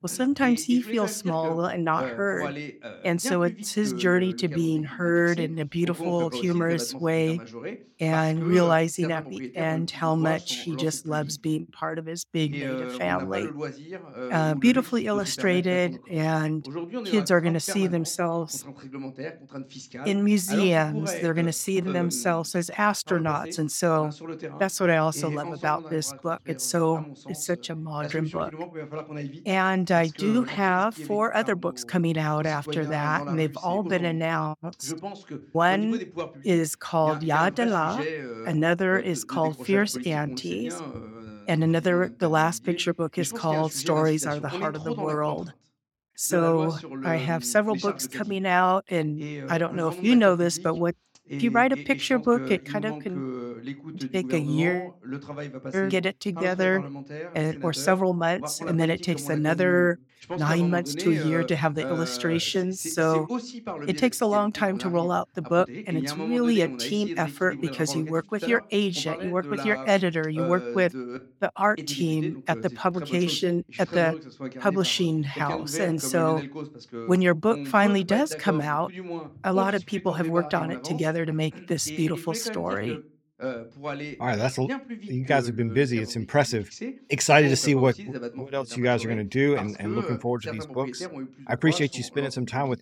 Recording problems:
voice in the background; noticeable; throughout; 10 dB below the speech

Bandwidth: 17 kHz